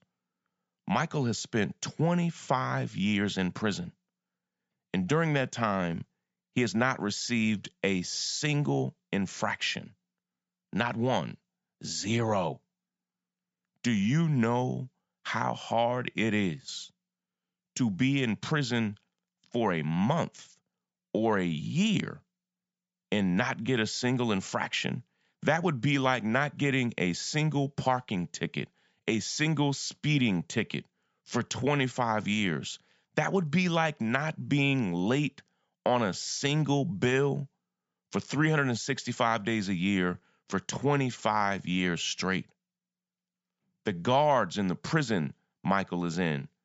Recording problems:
high frequencies cut off; noticeable; nothing above 8 kHz

